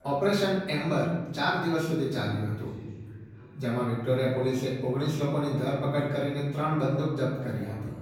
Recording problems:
off-mic speech; far
room echo; noticeable; dies away in 1.6 s
background chatter; faint; throughout; 3 voices, 20 dB below the speech

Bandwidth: 17 kHz